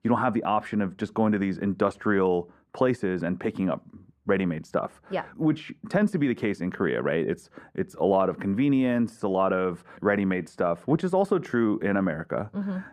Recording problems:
muffled; very; fading above 3 kHz

